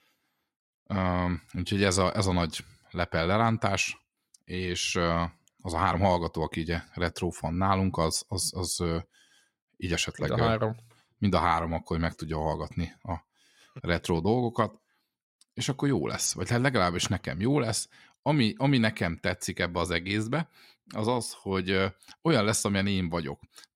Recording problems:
uneven, jittery; slightly; from 1.5 to 22 s

